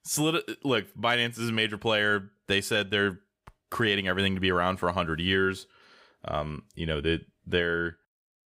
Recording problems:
none

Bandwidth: 15.5 kHz